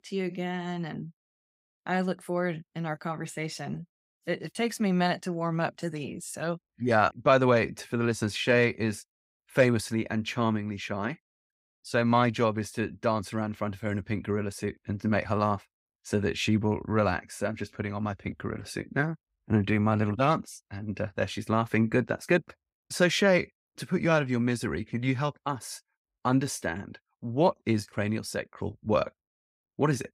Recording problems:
none

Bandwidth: 15.5 kHz